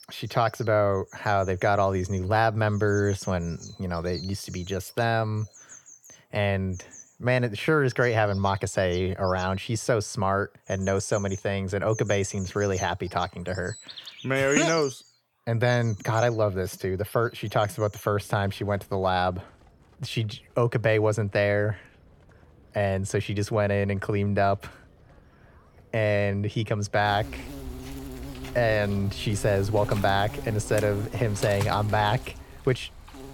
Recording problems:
animal sounds; noticeable; throughout; 15 dB below the speech

